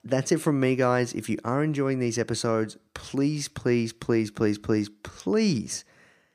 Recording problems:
none

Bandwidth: 15 kHz